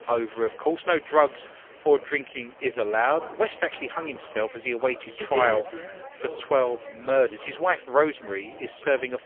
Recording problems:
phone-call audio; poor line; nothing above 3.5 kHz
chatter from many people; noticeable; throughout; 15 dB below the speech

